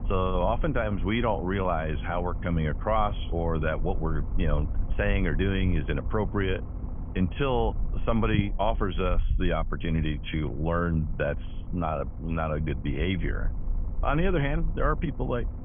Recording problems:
high frequencies cut off; severe; nothing above 3.5 kHz
low rumble; noticeable; throughout; 20 dB below the speech

